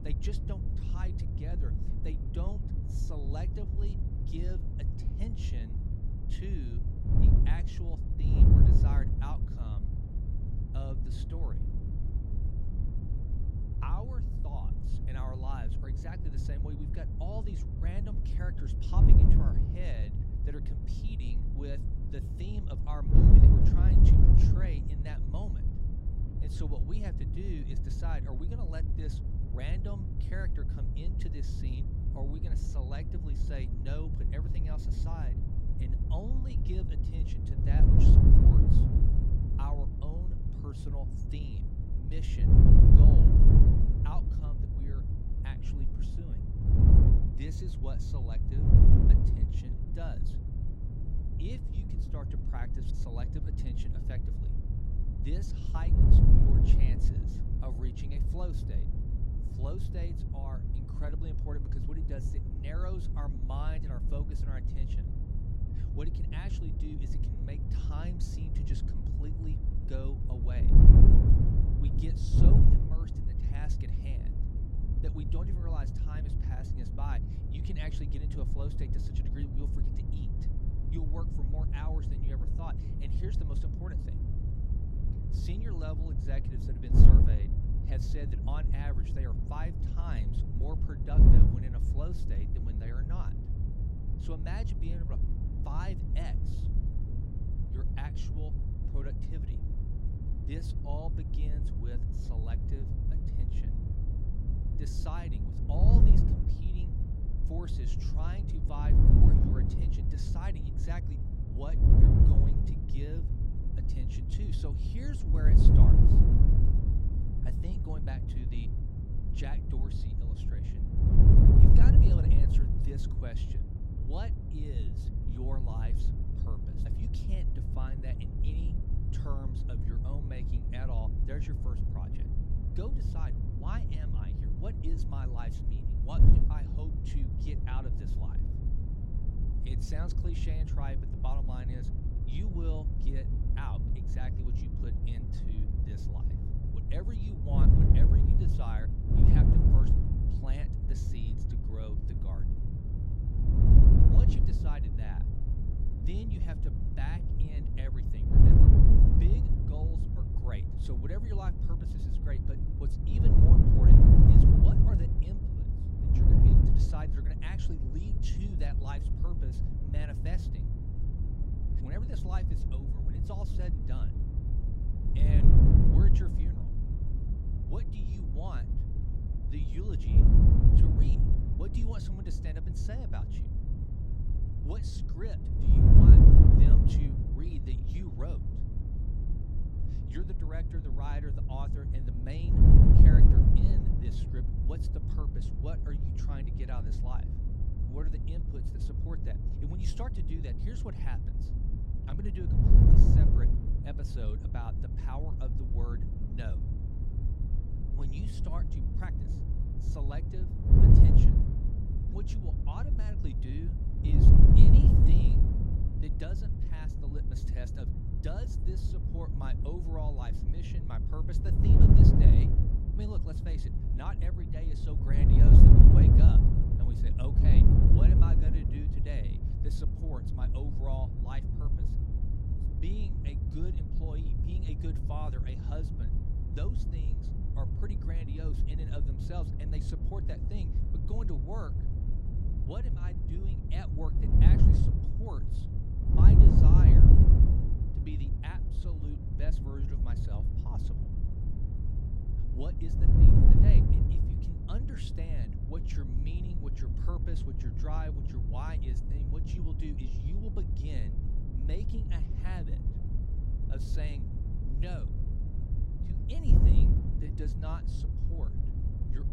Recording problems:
wind noise on the microphone; heavy; 5 dB above the speech

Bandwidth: 16 kHz